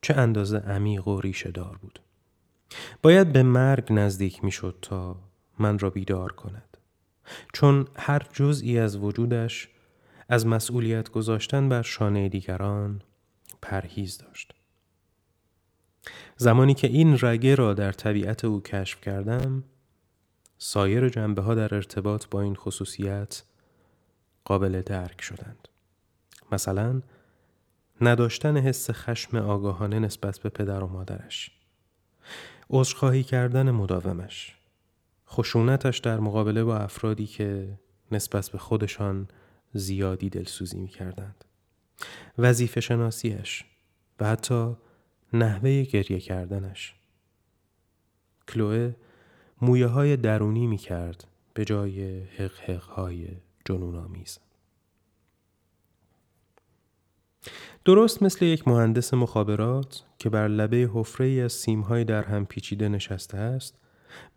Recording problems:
none

